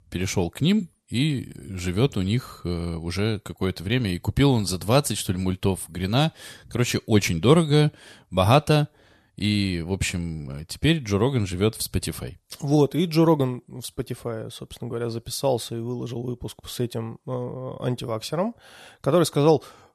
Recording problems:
none

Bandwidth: 13.5 kHz